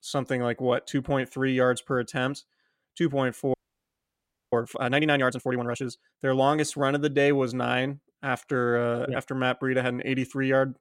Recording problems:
audio freezing; at 3.5 s for 1 s

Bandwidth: 16 kHz